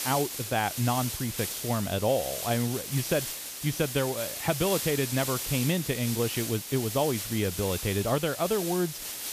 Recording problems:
high frequencies cut off; noticeable; nothing above 6.5 kHz
hiss; loud; throughout; 4 dB below the speech

